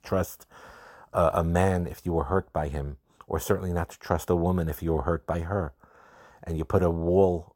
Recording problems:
none

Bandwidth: 16.5 kHz